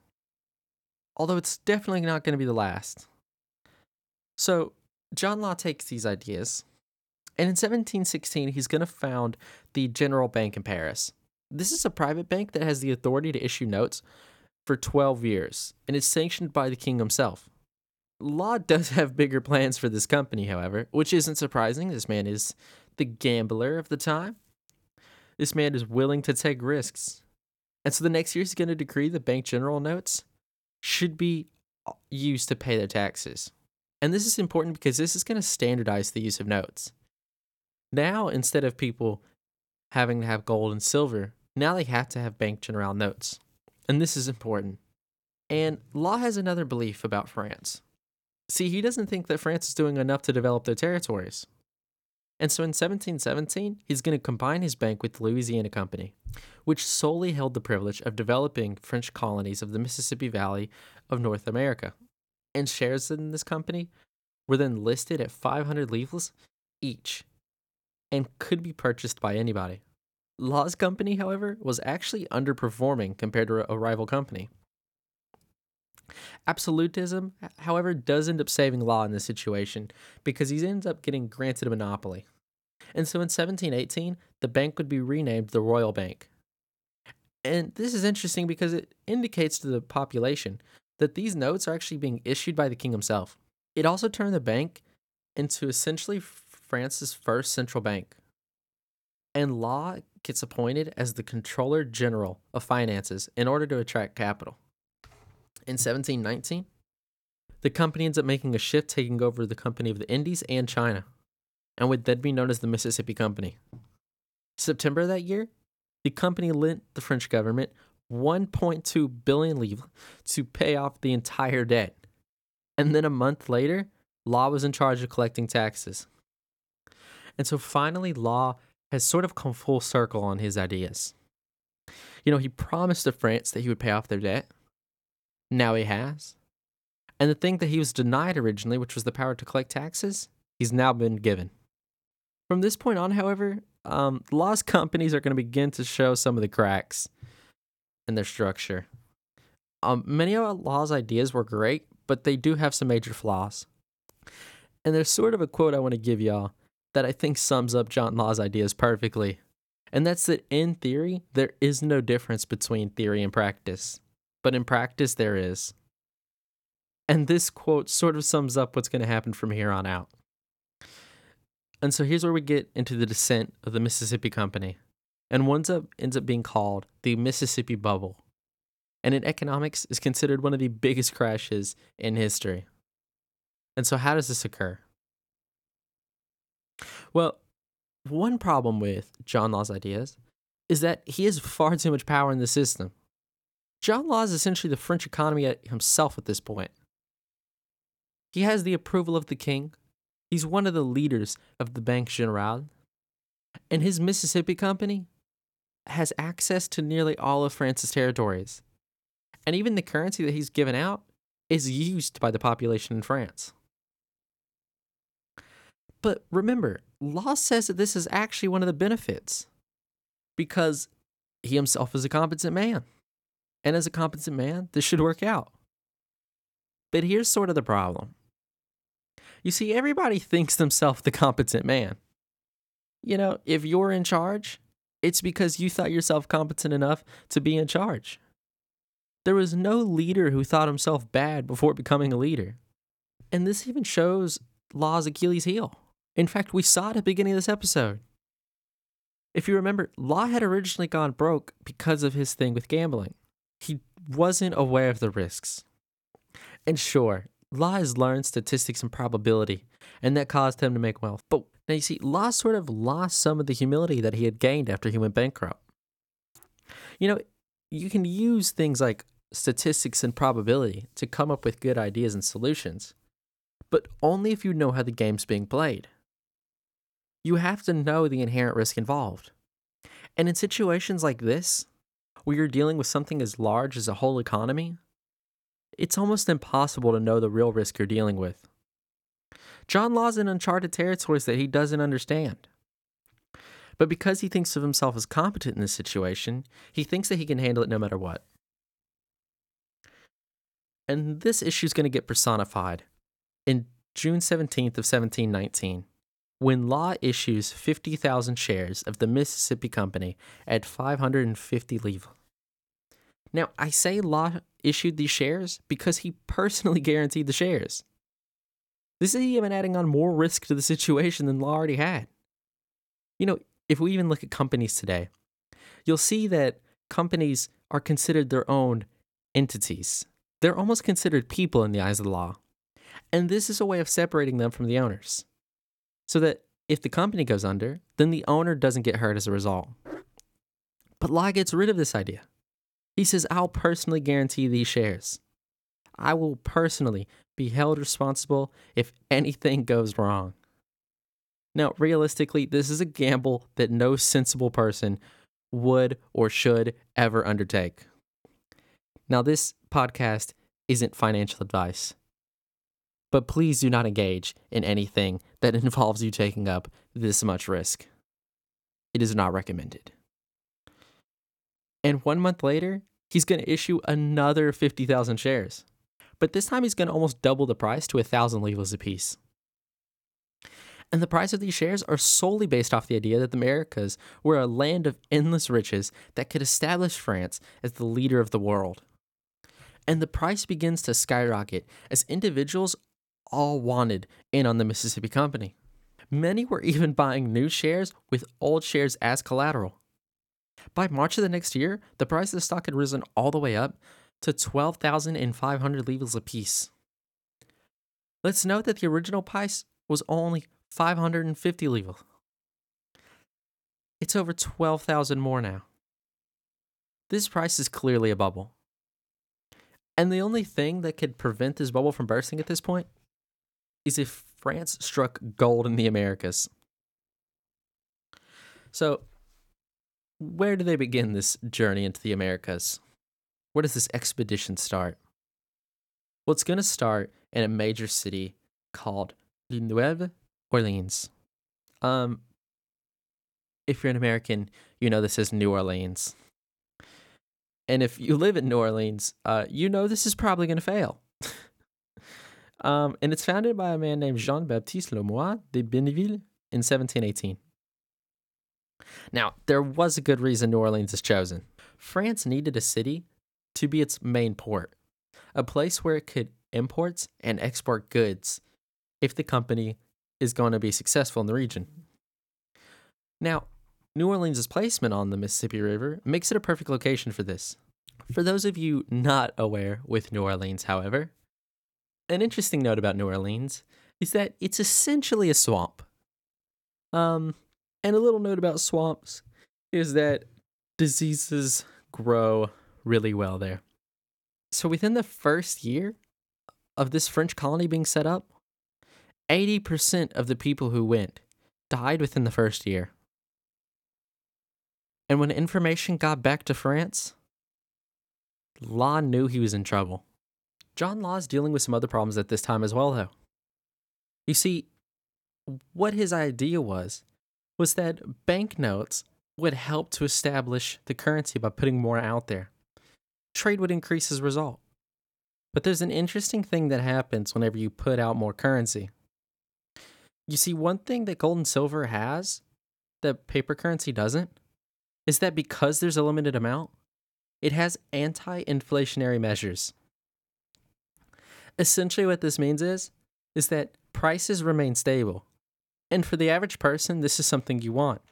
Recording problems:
none

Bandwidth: 17.5 kHz